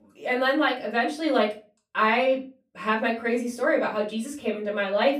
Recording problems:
off-mic speech; far
room echo; very slight; dies away in 0.3 s

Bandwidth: 15 kHz